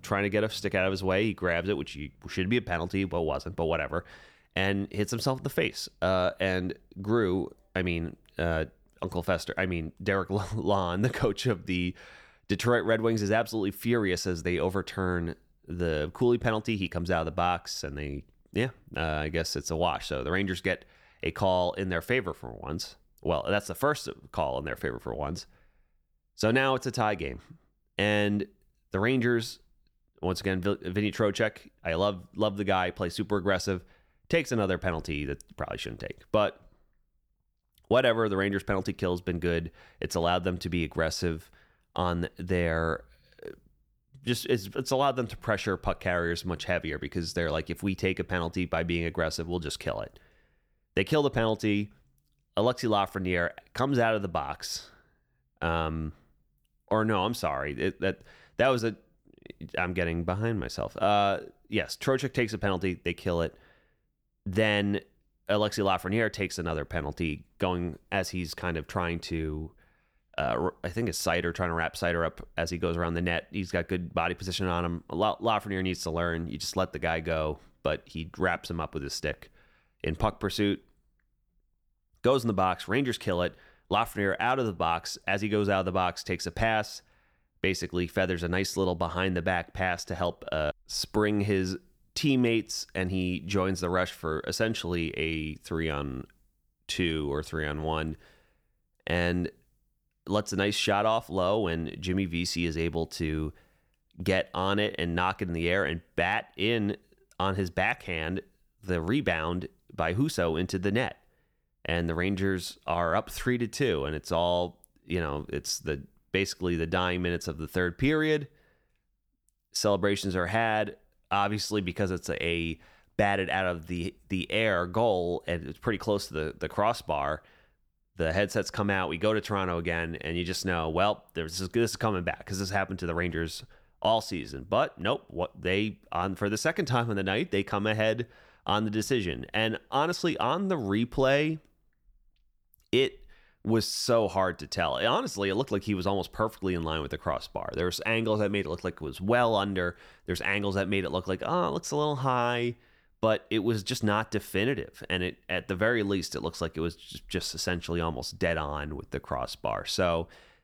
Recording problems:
none

